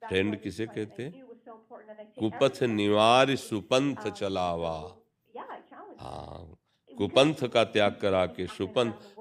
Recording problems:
voice in the background; faint; throughout; 20 dB below the speech

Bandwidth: 15.5 kHz